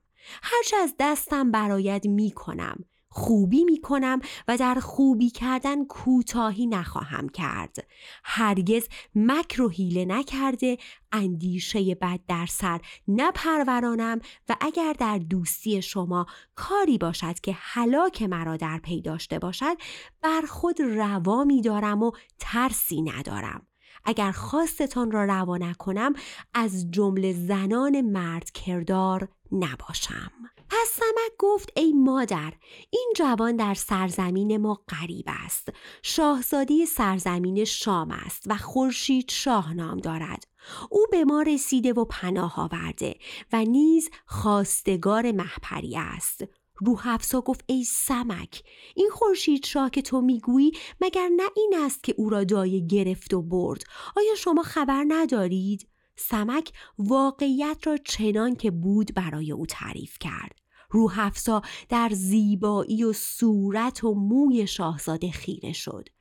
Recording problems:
none

